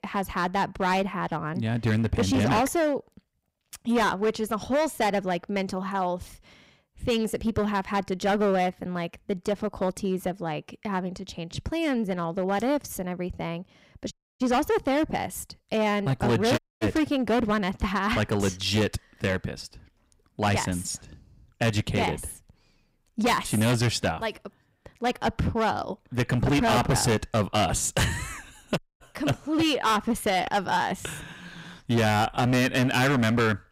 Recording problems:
distortion; heavy; 10% of the sound clipped
audio cutting out; at 14 s, at 17 s and at 29 s

